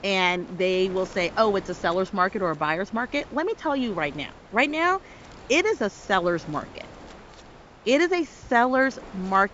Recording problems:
high frequencies cut off; noticeable; nothing above 8 kHz
wind noise on the microphone; occasional gusts; 20 dB below the speech

